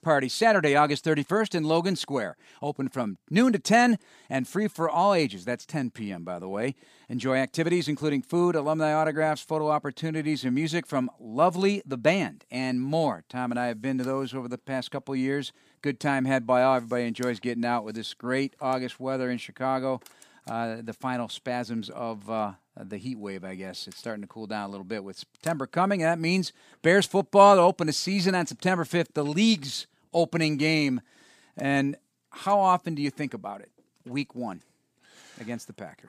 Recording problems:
none

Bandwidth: 15 kHz